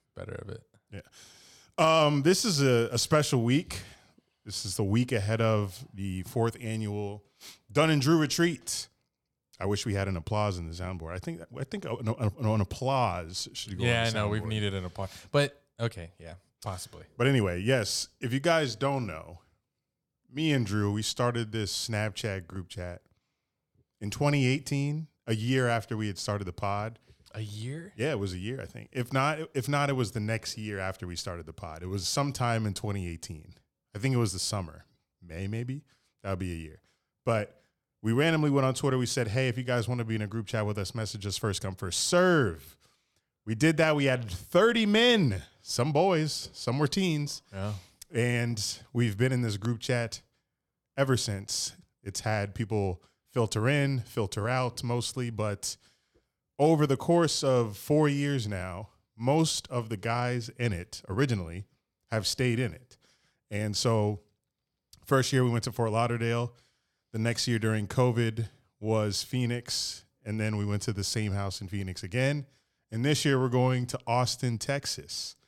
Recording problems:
none

